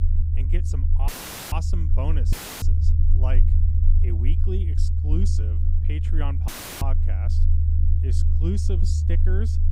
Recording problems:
low rumble; loud; throughout; 2 dB below the speech
audio cutting out; filled with static; at 1 s, at 2.5 s and at 6.5 s

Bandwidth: 15.5 kHz